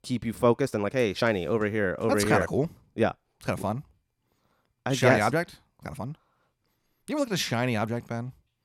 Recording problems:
uneven, jittery; strongly; from 0.5 to 8 s

